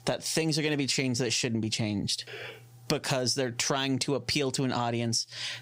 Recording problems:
squashed, flat; heavily

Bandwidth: 15.5 kHz